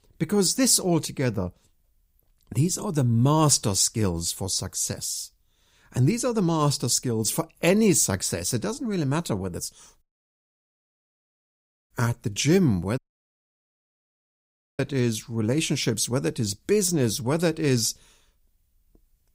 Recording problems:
audio cutting out; at 10 s for 2 s and at 13 s for 2 s

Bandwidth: 15.5 kHz